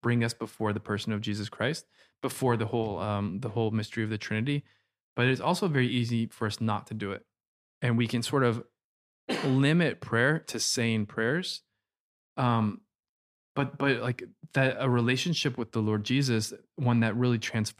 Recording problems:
none

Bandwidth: 15 kHz